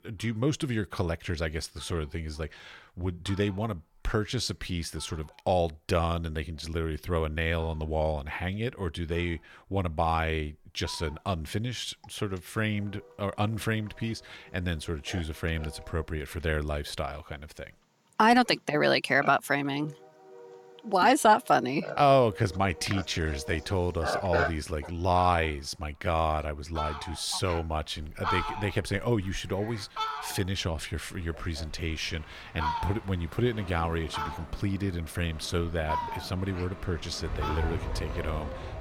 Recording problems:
animal sounds; loud; throughout; 9 dB below the speech
train or aircraft noise; noticeable; from 31 s on; 10 dB below the speech

